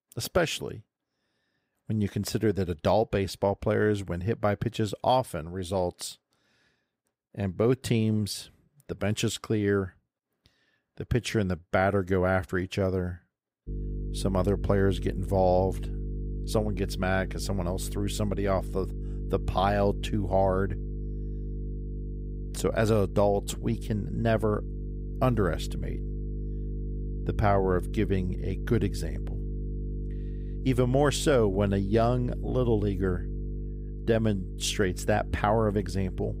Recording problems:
electrical hum; noticeable; from 14 s on; 50 Hz, 20 dB below the speech

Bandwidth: 15.5 kHz